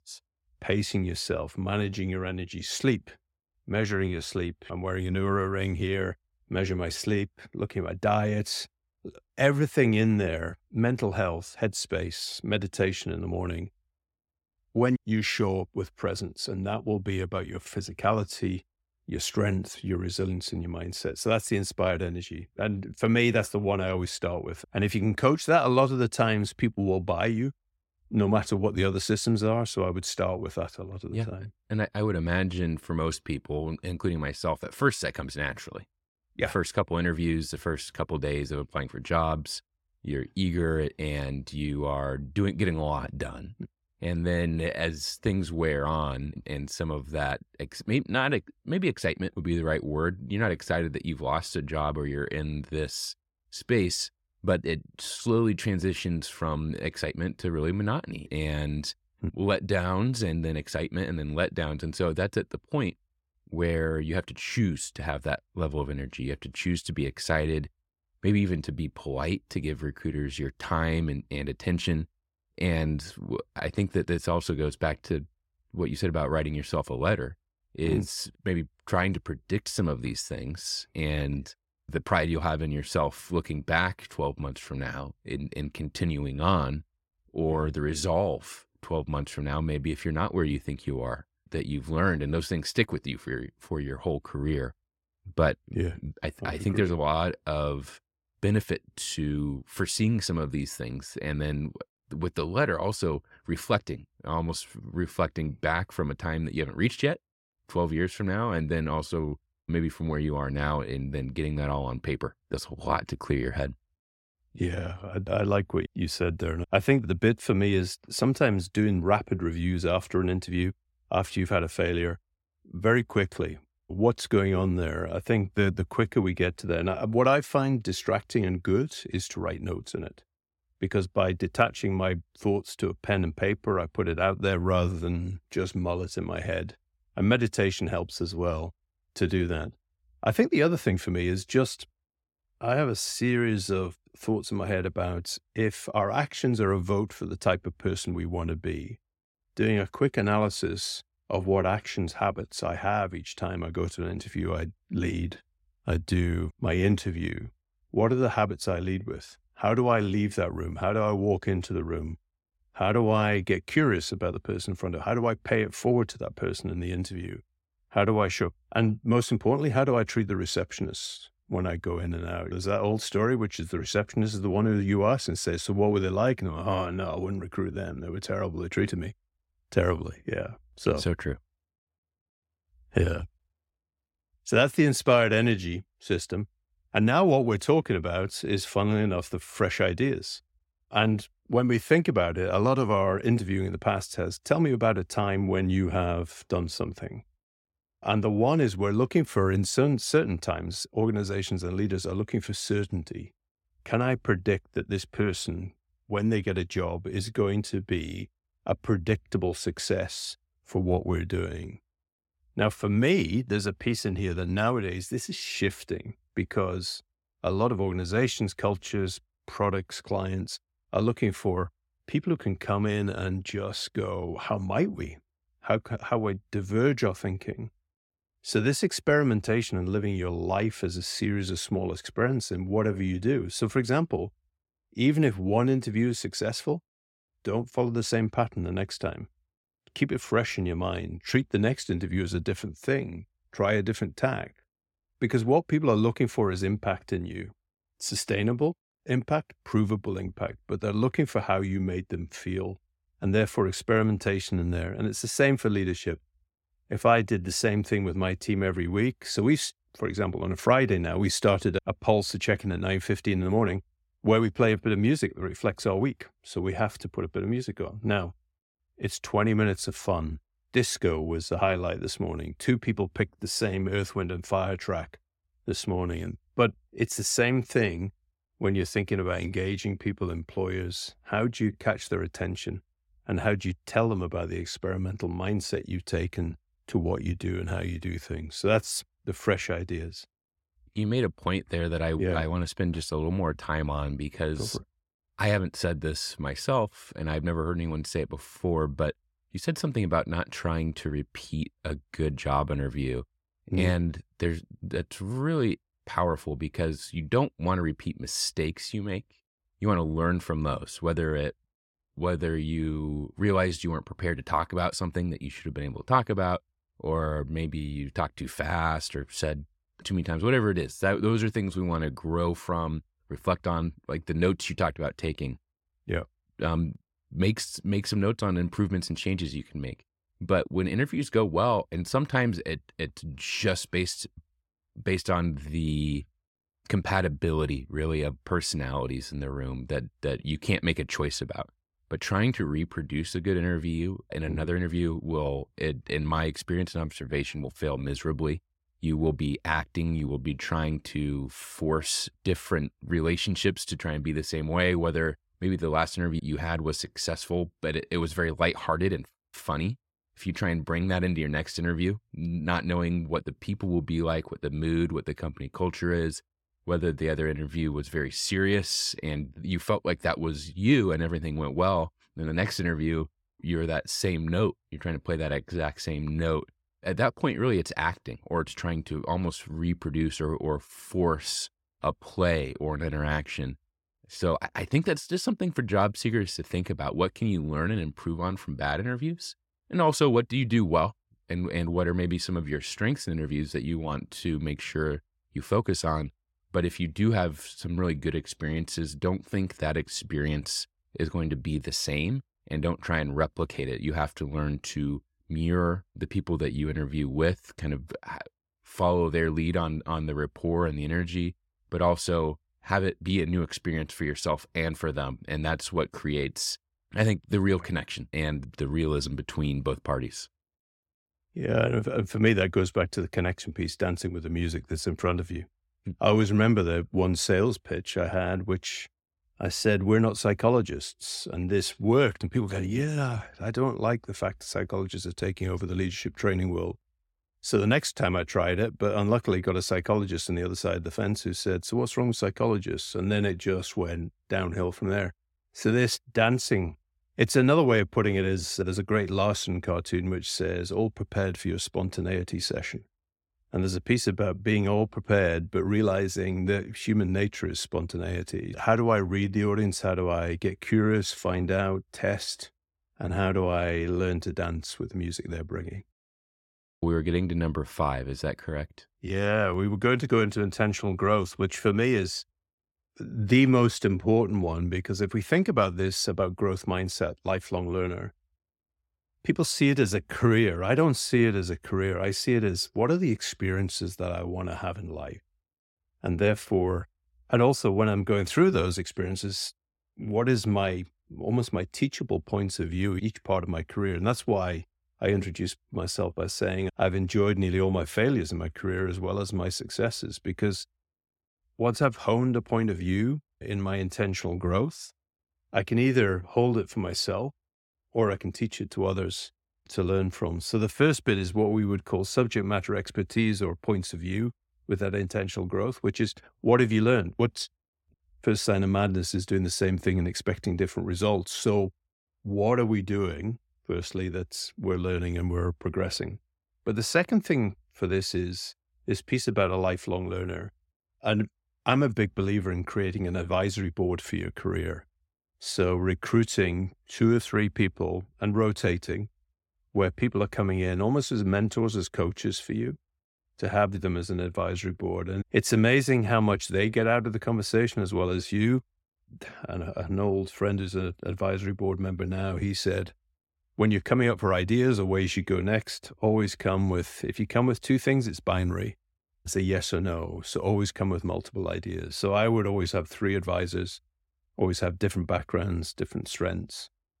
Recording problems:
none

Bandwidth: 16.5 kHz